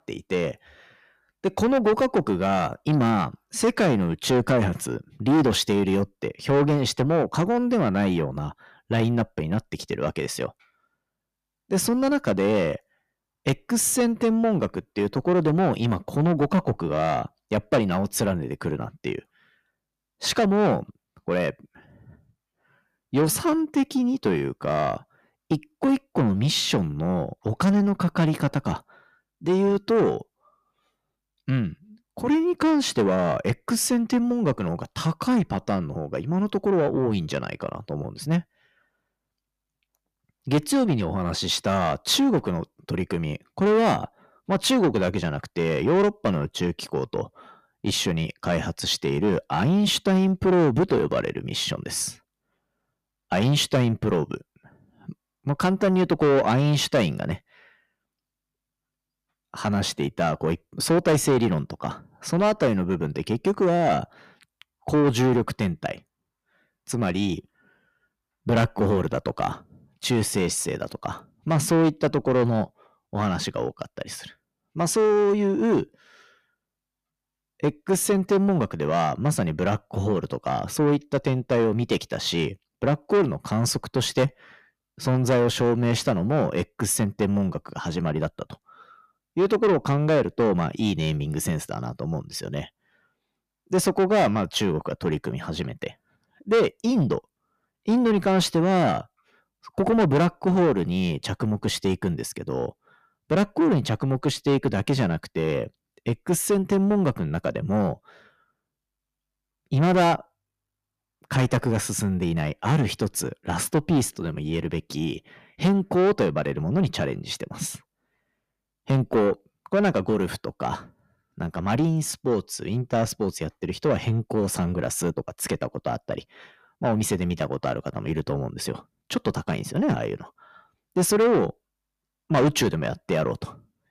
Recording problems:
distortion; heavy; 7 dB below the speech

